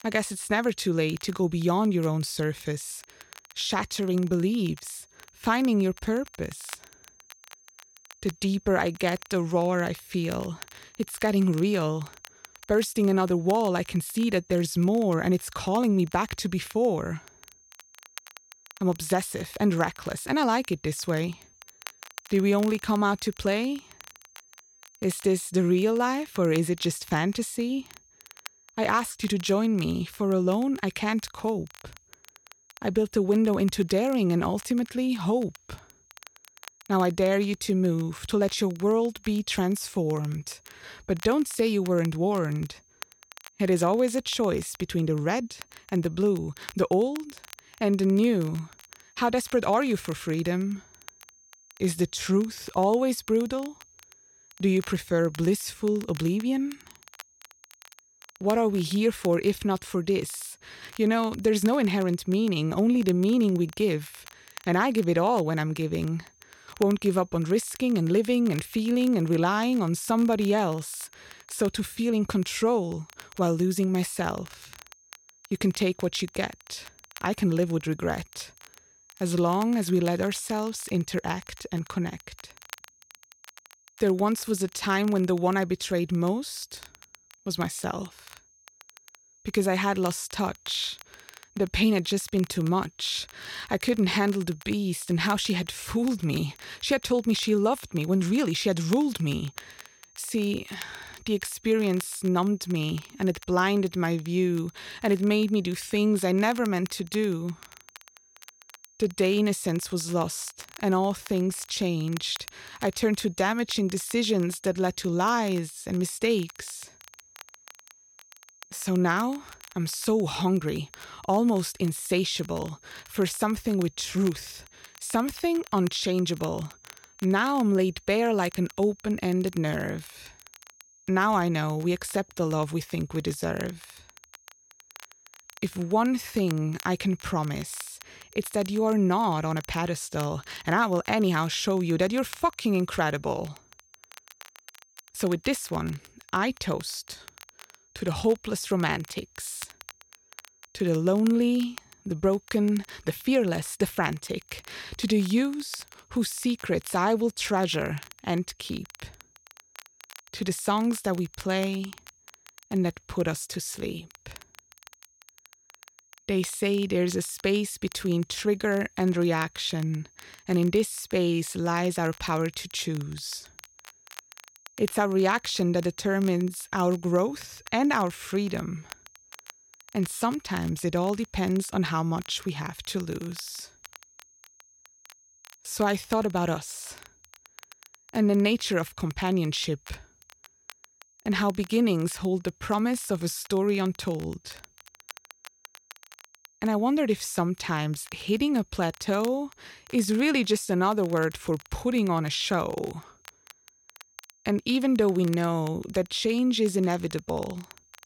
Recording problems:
high-pitched whine; faint; throughout; 6.5 kHz, 30 dB below the speech
crackle, like an old record; faint; 20 dB below the speech

